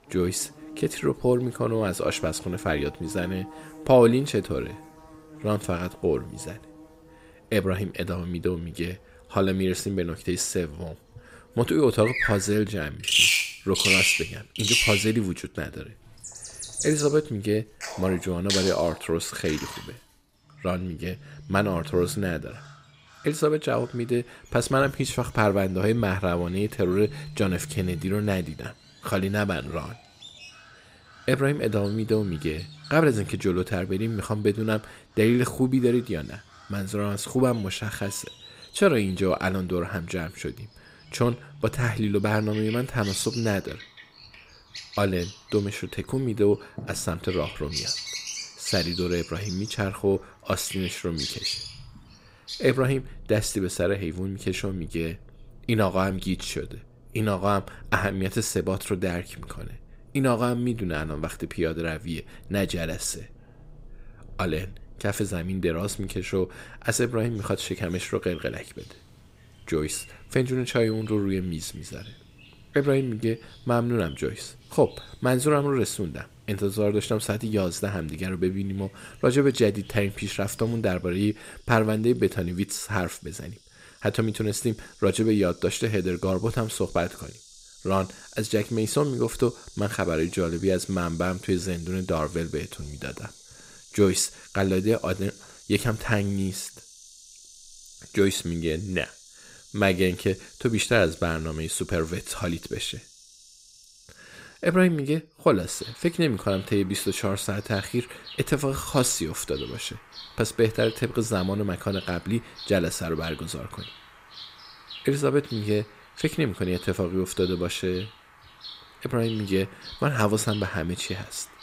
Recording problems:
animal sounds; loud; throughout; 6 dB below the speech

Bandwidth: 15.5 kHz